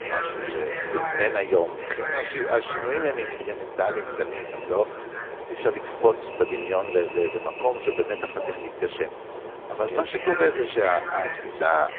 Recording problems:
phone-call audio; poor line
traffic noise; loud; throughout; 6 dB below the speech

